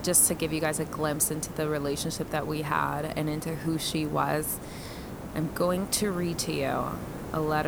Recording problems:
hiss; noticeable; throughout; 10 dB below the speech
abrupt cut into speech; at the end

